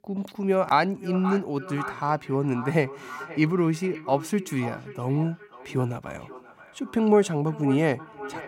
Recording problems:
echo of what is said; noticeable; throughout; 530 ms later, 15 dB below the speech

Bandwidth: 16 kHz